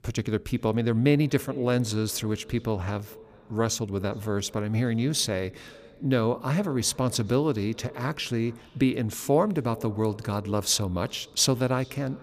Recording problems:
echo of what is said; faint; throughout; 420 ms later, 20 dB below the speech

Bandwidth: 15 kHz